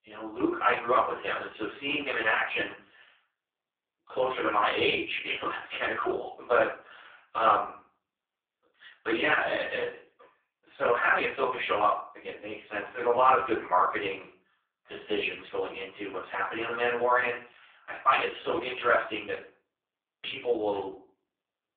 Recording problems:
phone-call audio; poor line
off-mic speech; far
room echo; noticeable; dies away in 0.4 s

